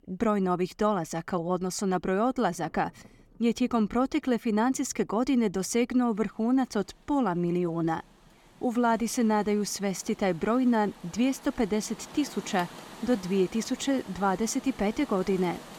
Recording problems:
rain or running water; noticeable; throughout; 20 dB below the speech

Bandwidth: 17 kHz